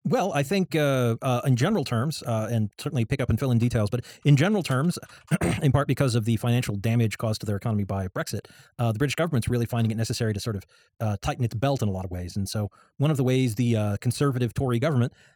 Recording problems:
wrong speed, natural pitch; too fast; 1.5 times normal speed

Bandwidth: 18 kHz